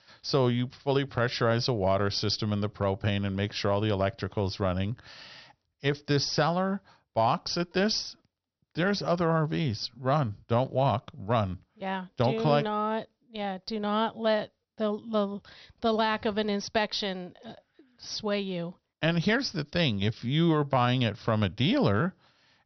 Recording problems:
high frequencies cut off; noticeable; nothing above 6 kHz

